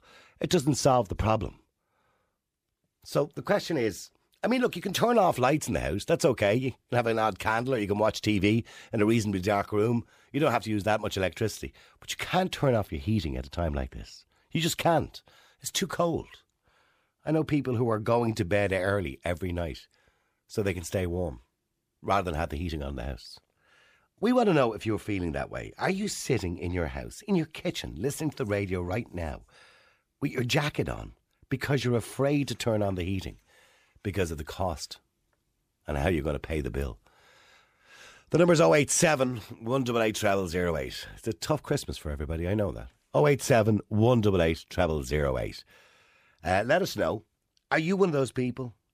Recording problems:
none

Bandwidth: 15 kHz